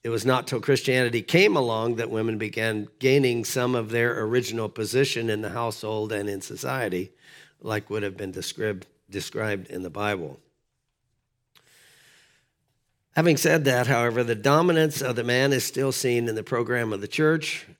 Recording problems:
none

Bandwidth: 18 kHz